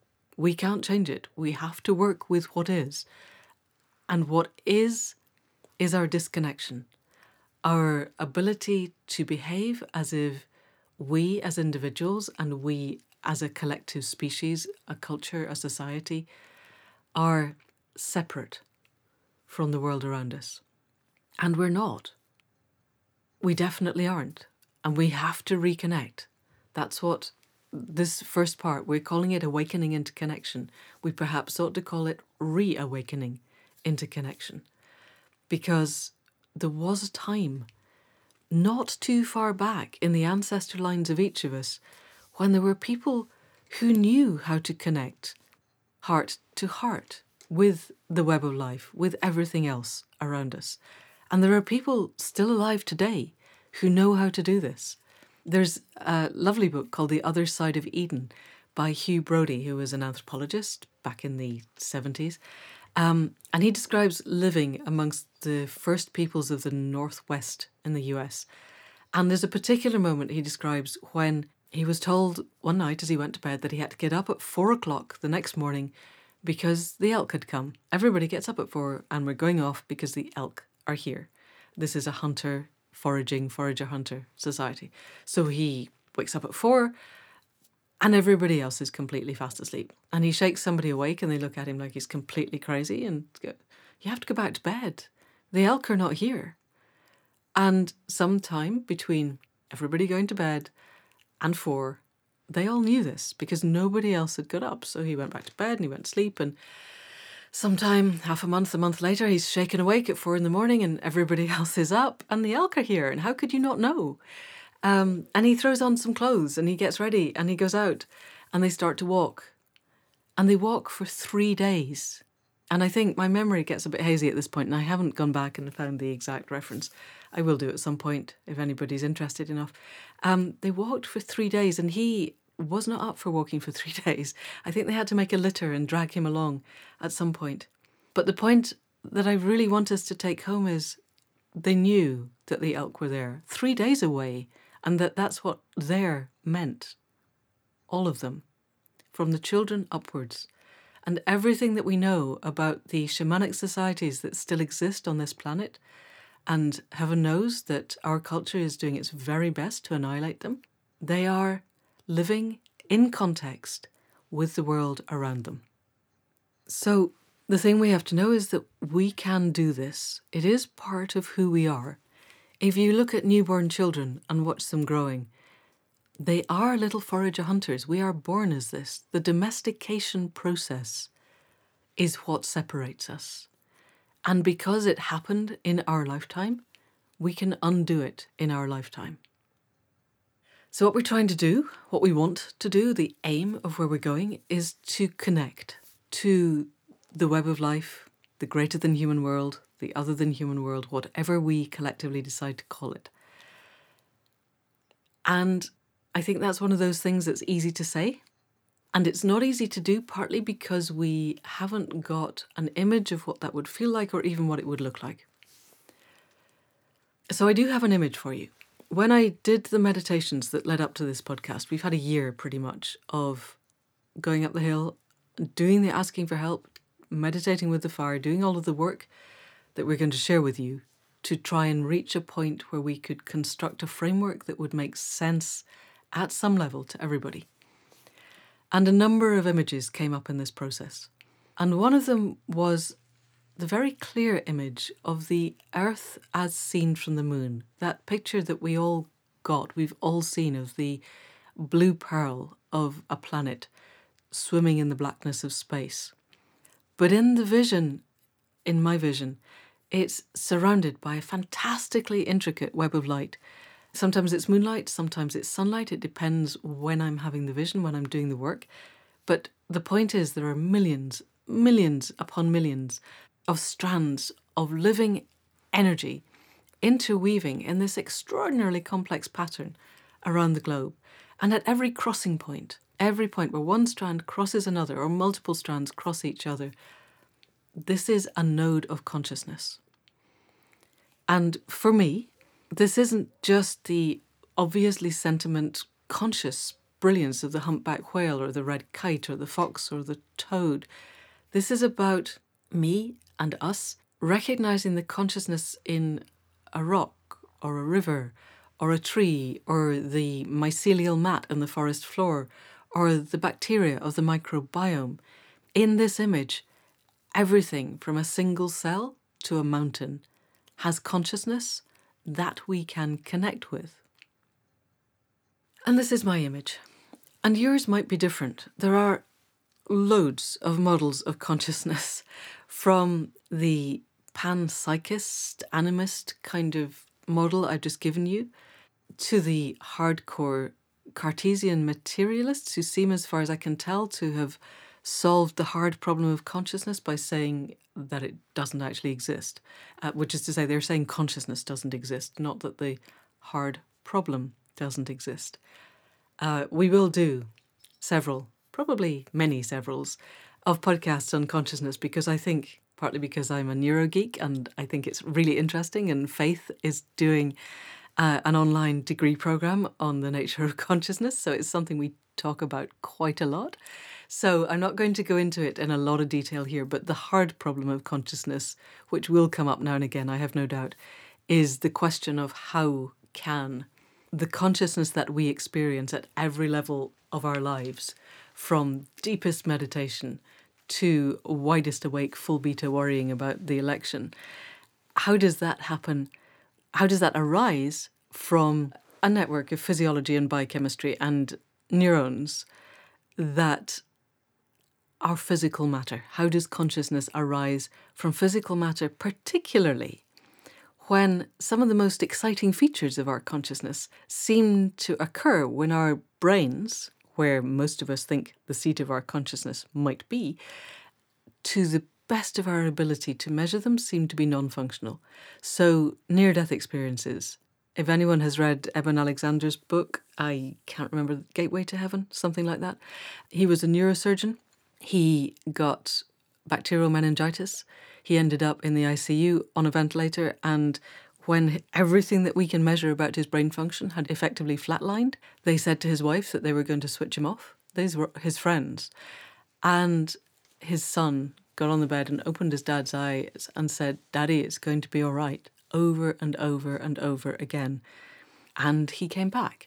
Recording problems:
none

